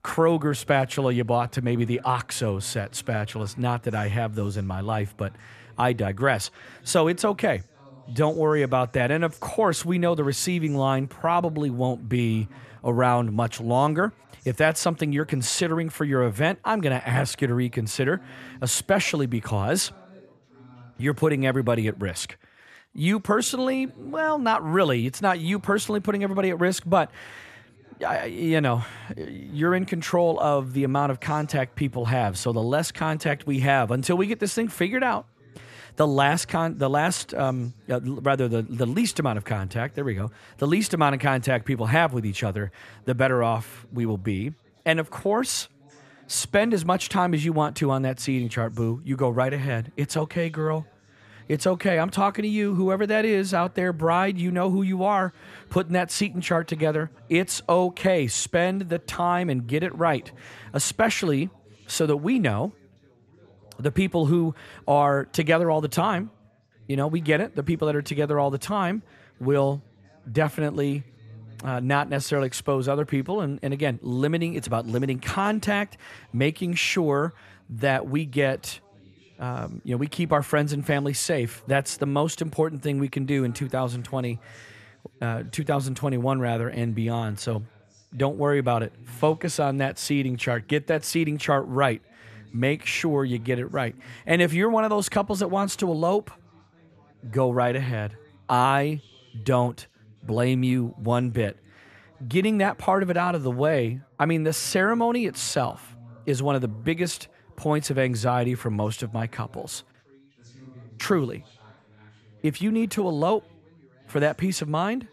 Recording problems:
background chatter; faint; throughout; 3 voices, 30 dB below the speech

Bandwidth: 14 kHz